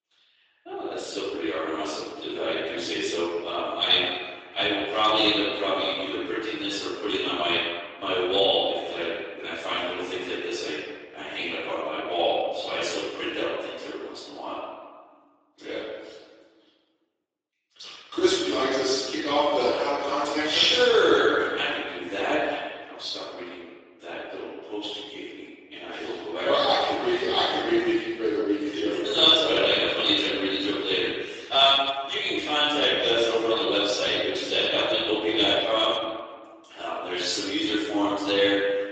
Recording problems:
room echo; strong; dies away in 1.5 s
off-mic speech; far
thin; somewhat; fading below 300 Hz
garbled, watery; slightly; nothing above 7.5 kHz

